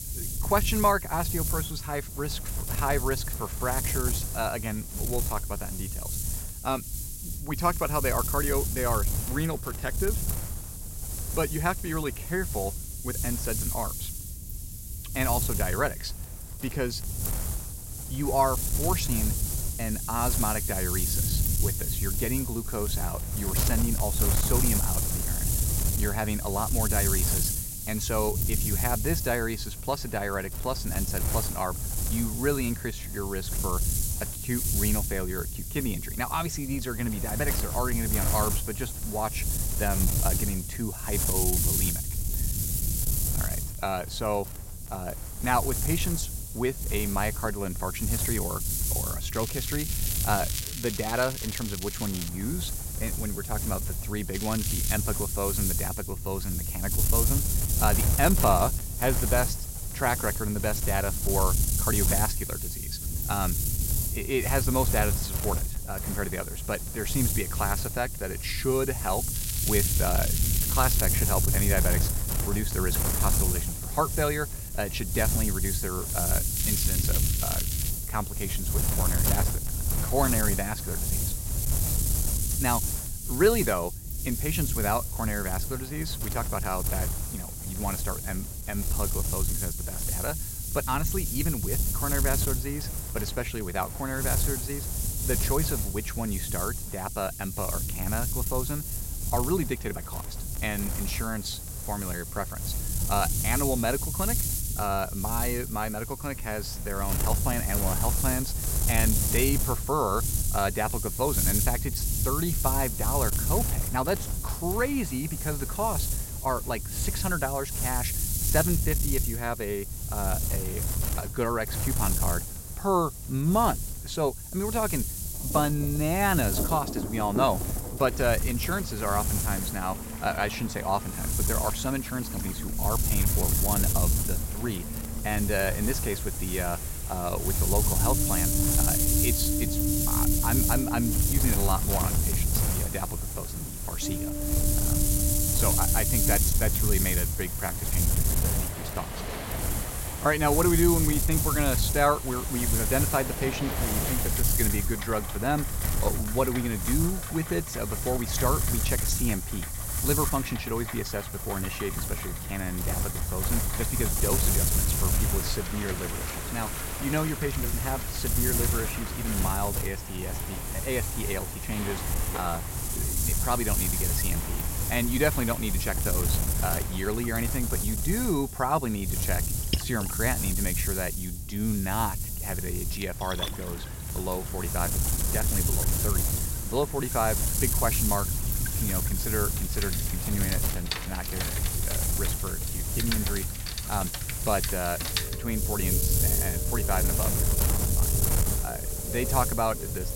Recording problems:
wind noise on the microphone; heavy; 3 dB below the speech
rain or running water; loud; from 2:05 on; 8 dB below the speech
crackling; loud; 4 times, first at 49 s; 4 dB below the speech

